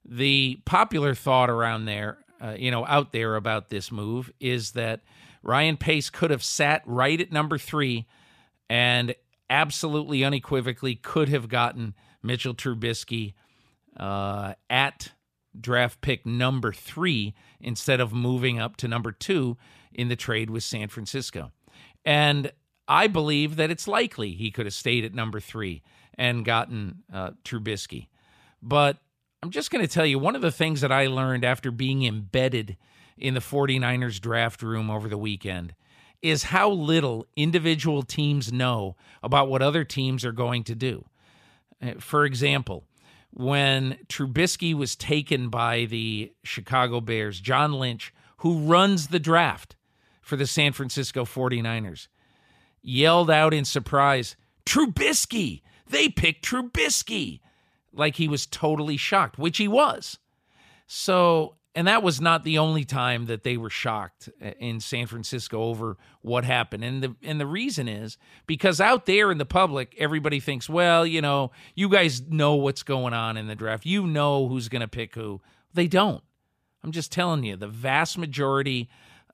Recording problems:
none

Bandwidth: 14.5 kHz